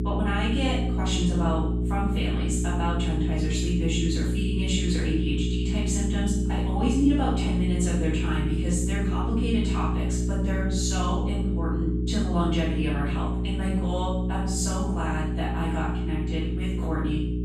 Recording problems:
room echo; strong; dies away in 0.7 s
off-mic speech; far
electrical hum; loud; throughout; 60 Hz, 5 dB below the speech

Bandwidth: 14 kHz